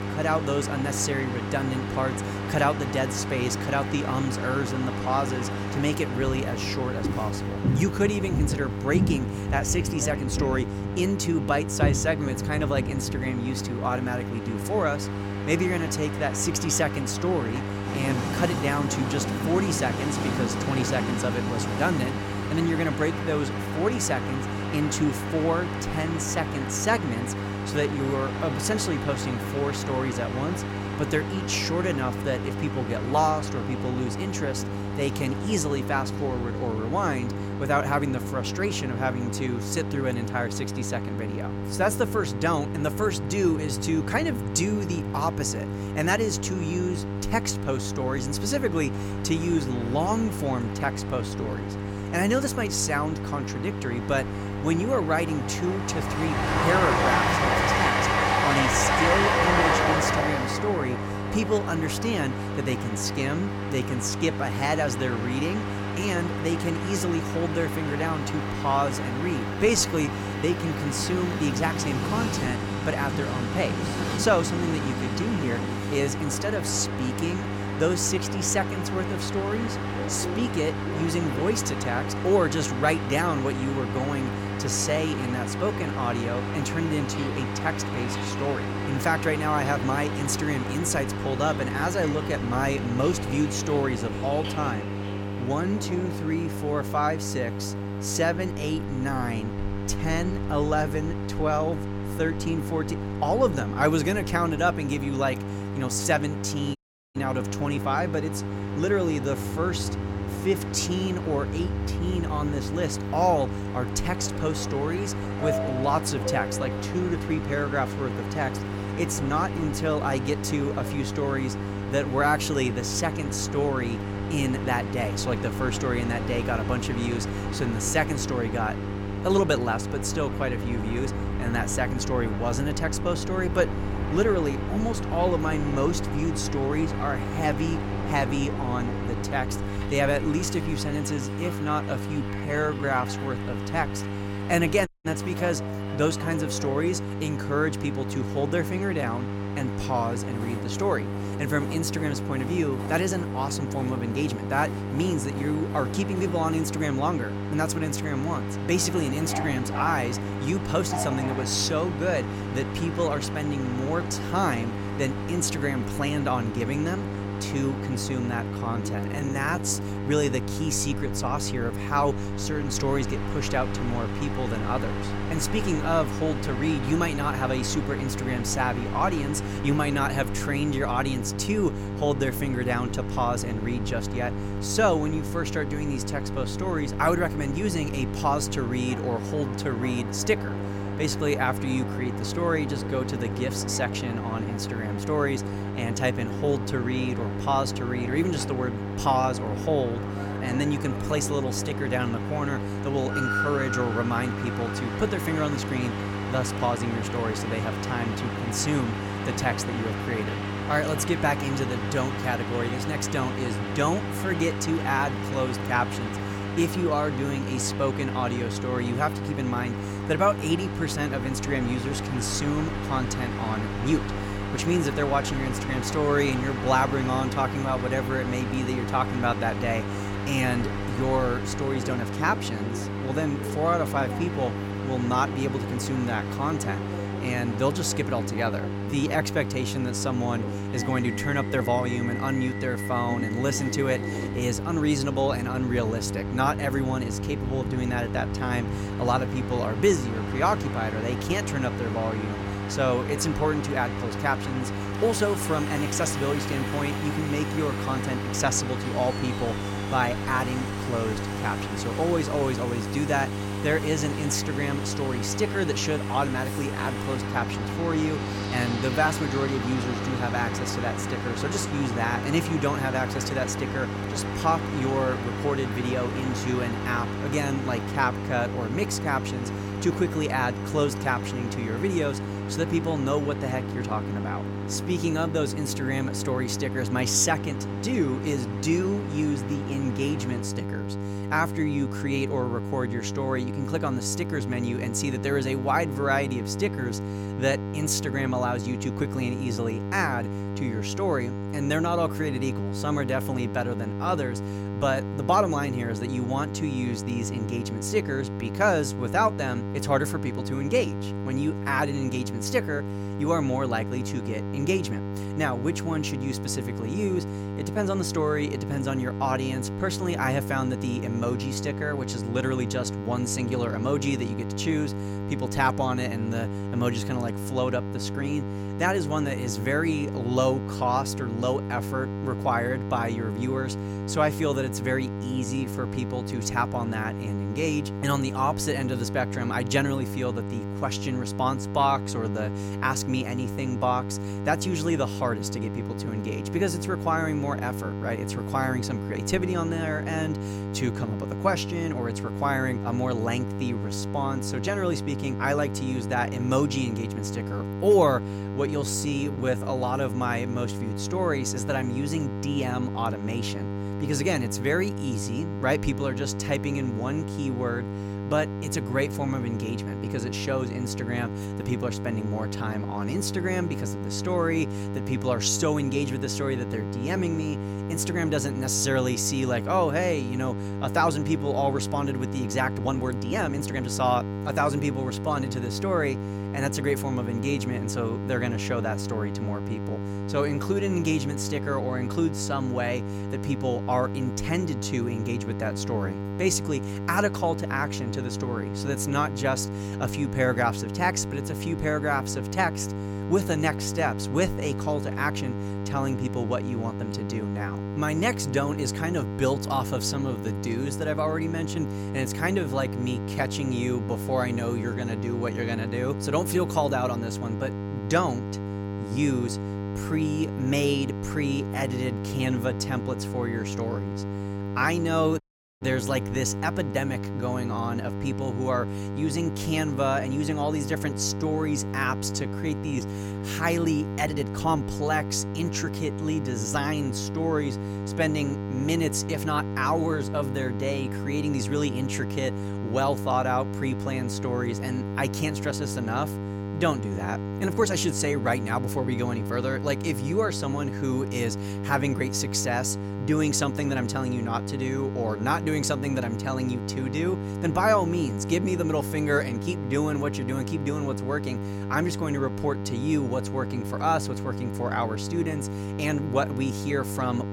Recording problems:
electrical hum; loud; throughout; 50 Hz, 9 dB below the speech
train or aircraft noise; loud; until 4:50; 7 dB below the speech
uneven, jittery; strongly; from 1:10 to 7:28
audio cutting out; at 1:47, at 2:25 and at 7:05

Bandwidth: 17 kHz